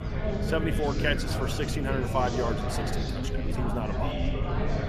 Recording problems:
chatter from many people; loud; throughout; 2 dB below the speech
low rumble; noticeable; throughout; 15 dB below the speech

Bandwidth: 14.5 kHz